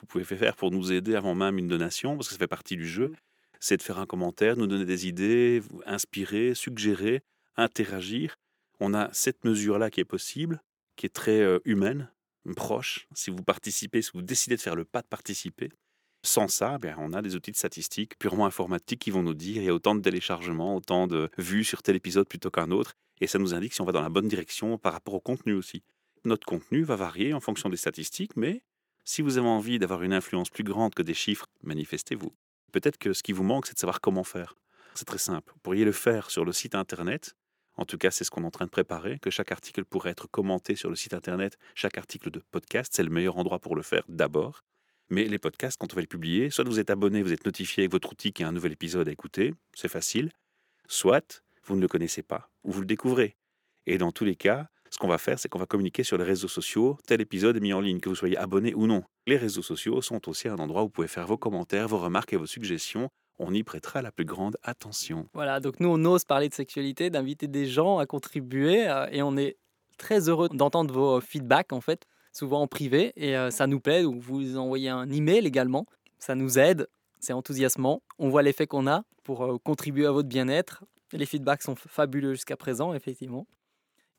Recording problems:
none

